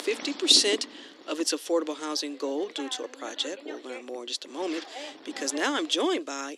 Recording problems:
thin; somewhat; fading below 300 Hz
wind noise on the microphone; occasional gusts; 15 dB below the speech

